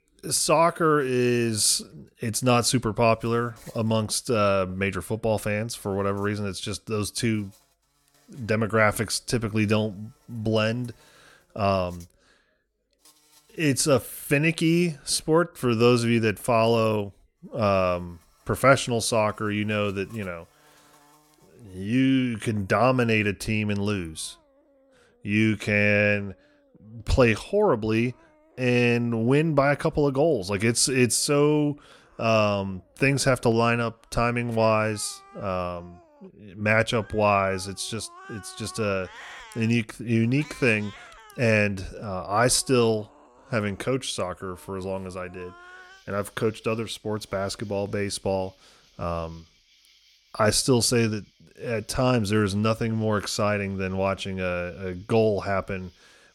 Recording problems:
animal sounds; faint; throughout; 30 dB below the speech

